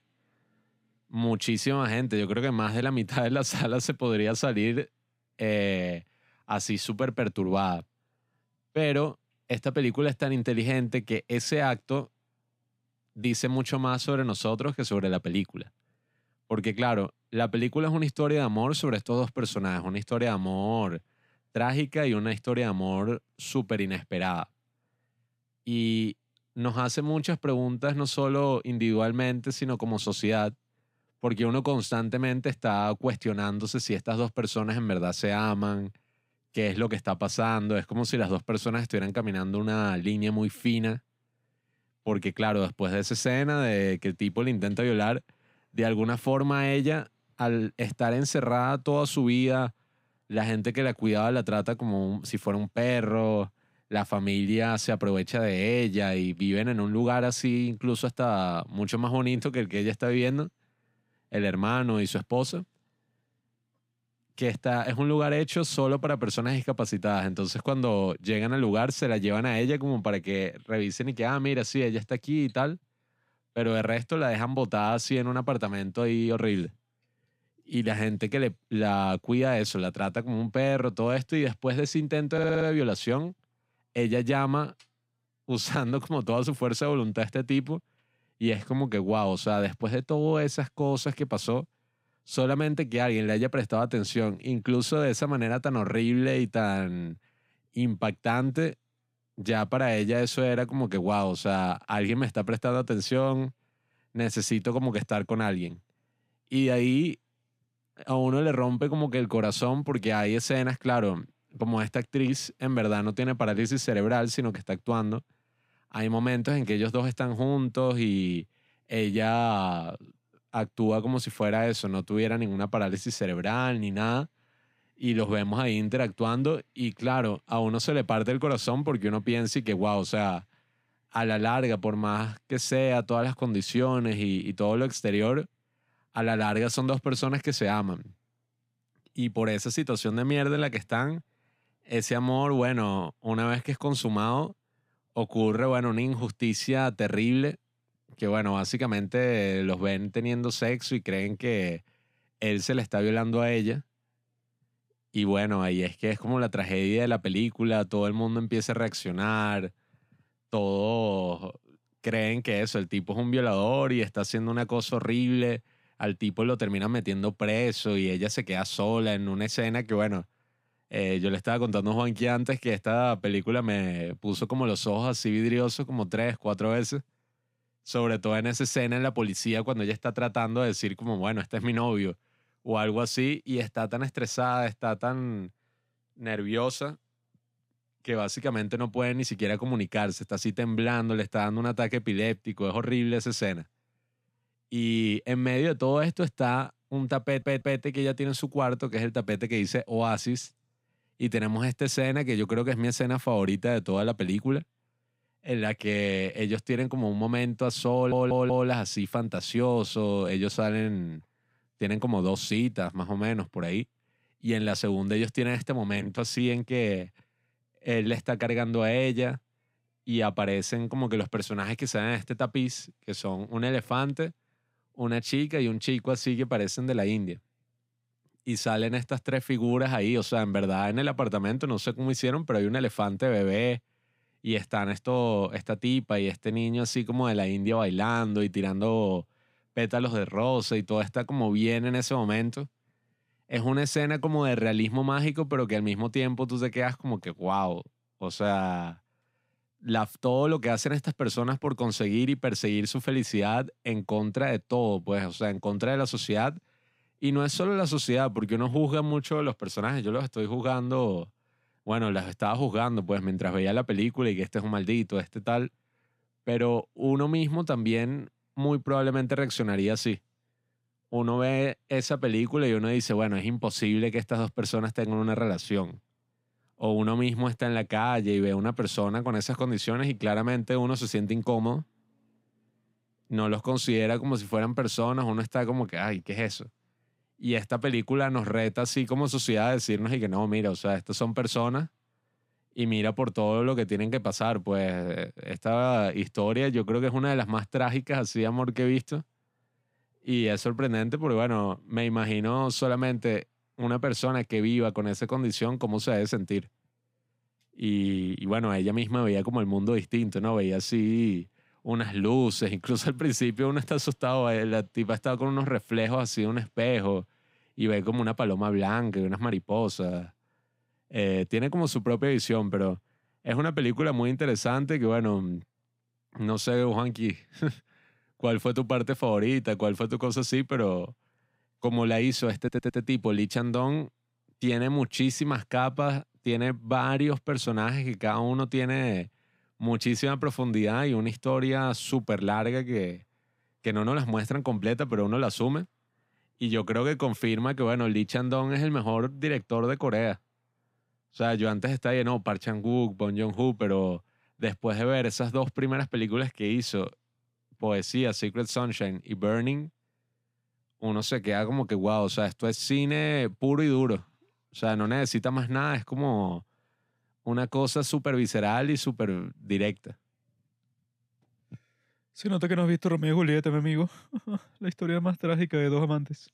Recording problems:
audio stuttering; 4 times, first at 1:22

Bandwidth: 15.5 kHz